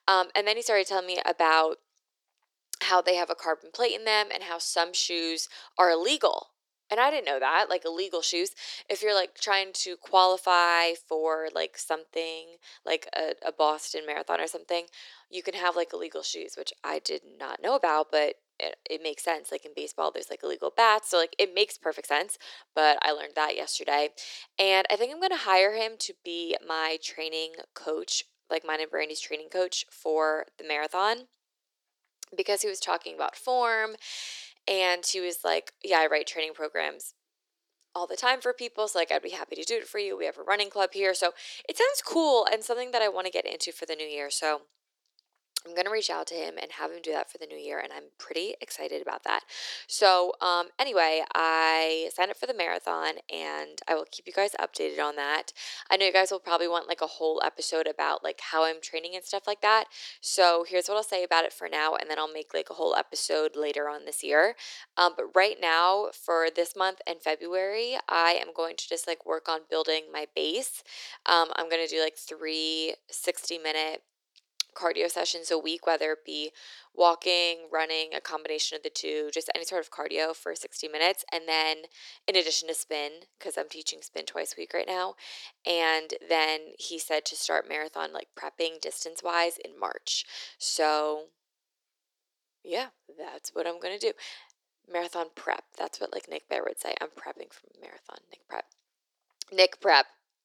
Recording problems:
thin; very; fading below 350 Hz

